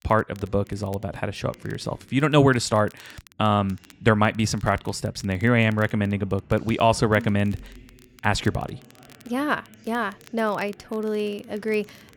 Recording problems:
voice in the background; faint; throughout; 30 dB below the speech
crackle, like an old record; faint; 30 dB below the speech

